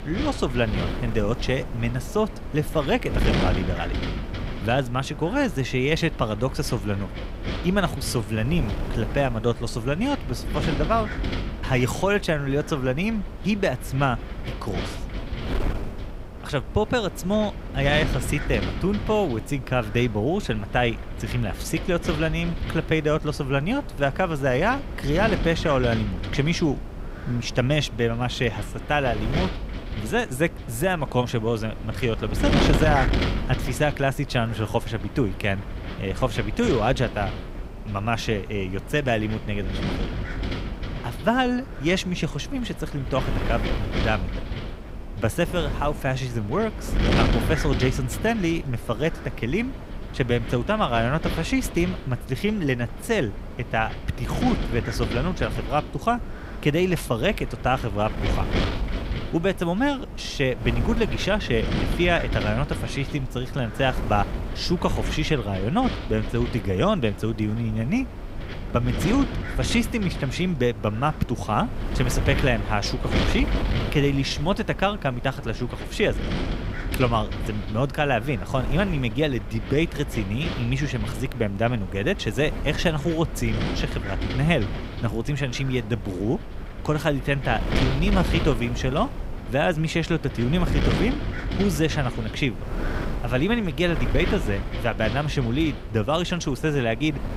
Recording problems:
wind noise on the microphone; heavy; 9 dB below the speech

